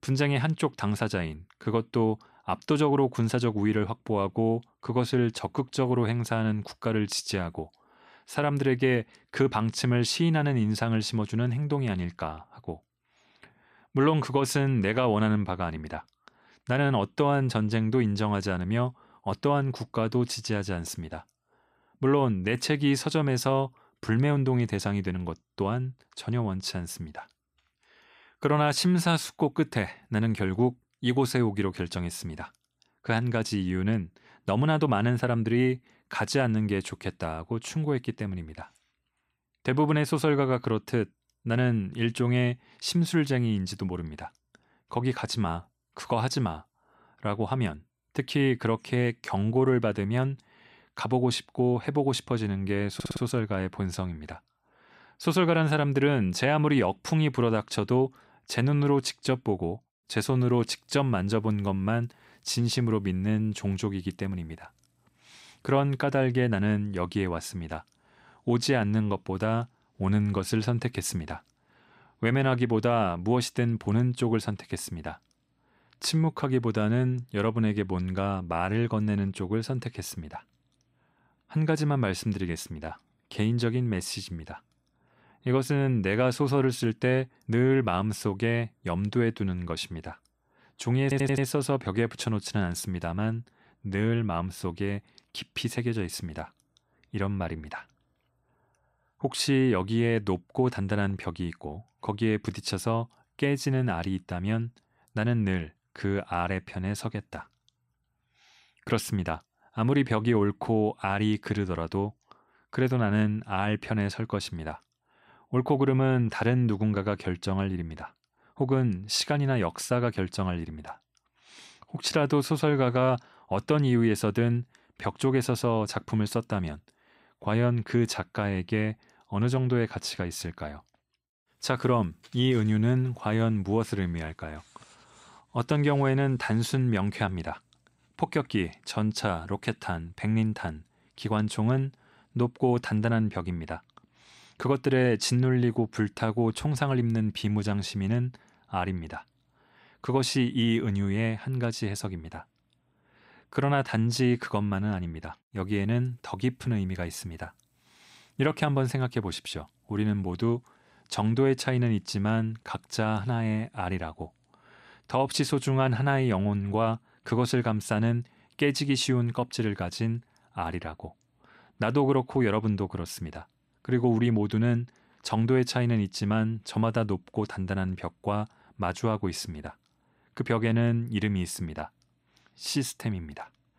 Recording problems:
audio stuttering; at 53 s and at 1:31

